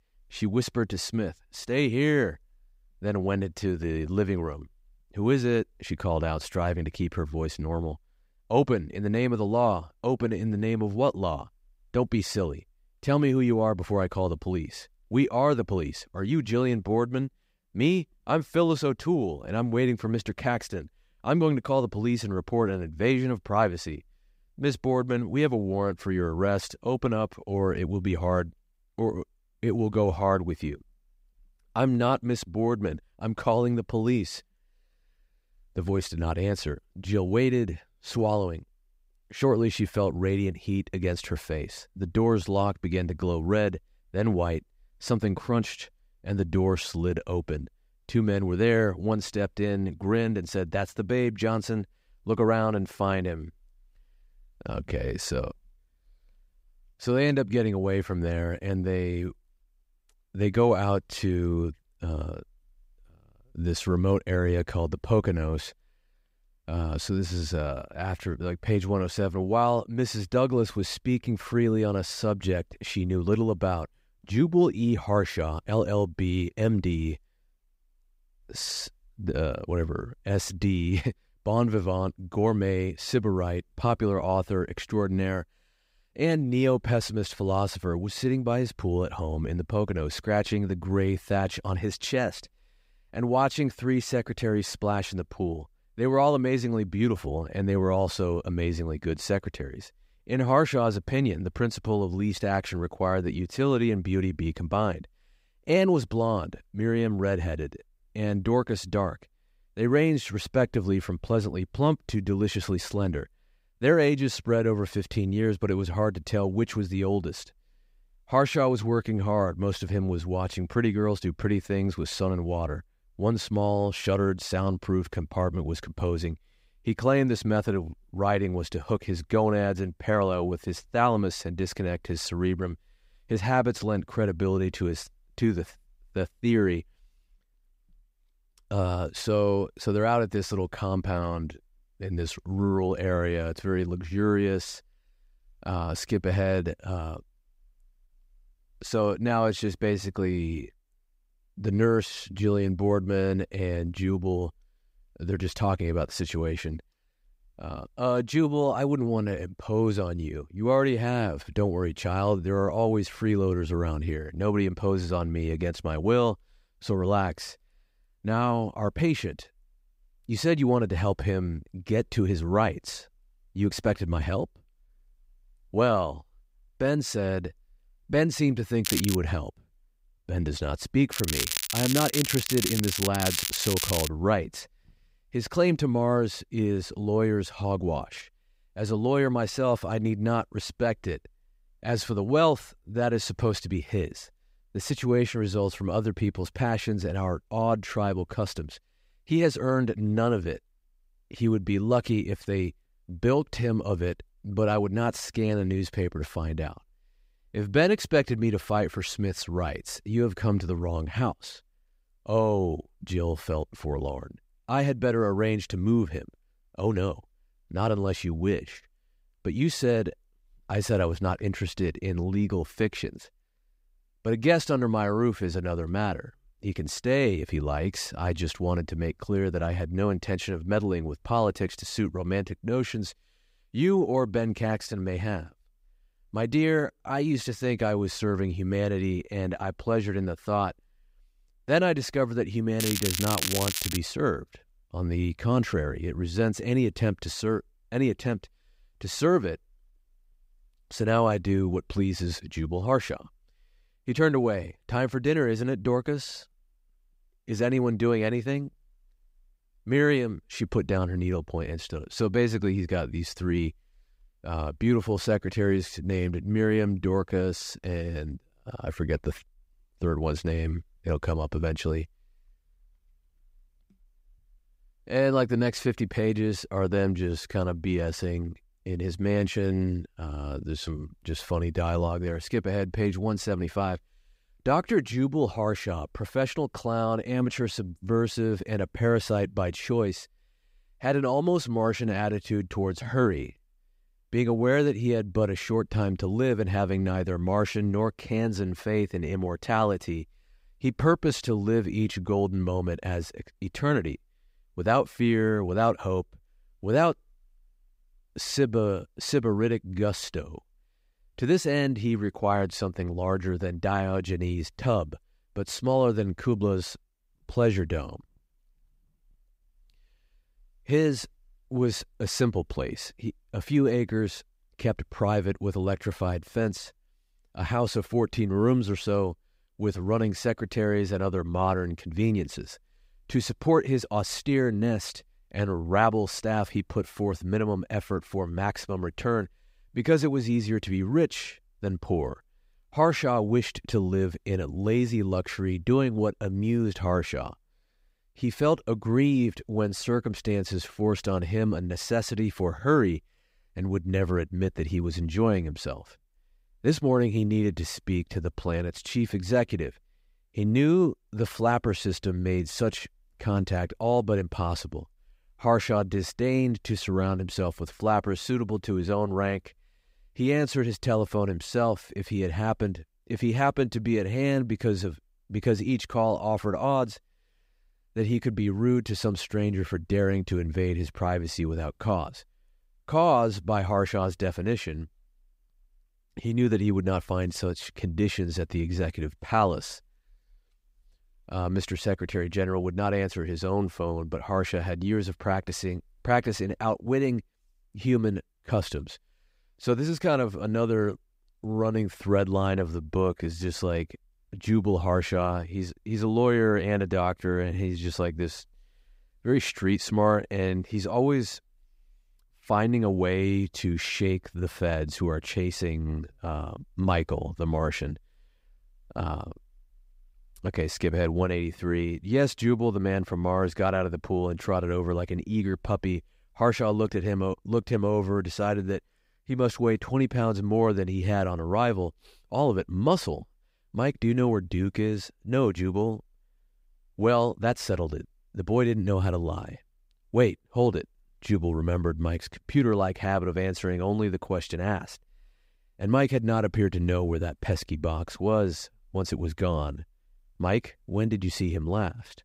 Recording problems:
crackling; loud; at 2:59, from 3:01 to 3:04 and from 4:03 to 4:04; 2 dB below the speech

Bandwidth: 15.5 kHz